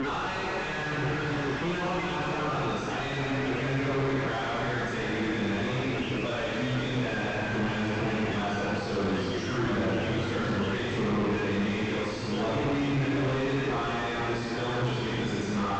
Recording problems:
distortion; heavy; 2 dB below the speech
room echo; strong; dies away in 2.5 s
off-mic speech; far
high frequencies cut off; noticeable; nothing above 8 kHz
voice in the background; loud; throughout; 3 dB below the speech

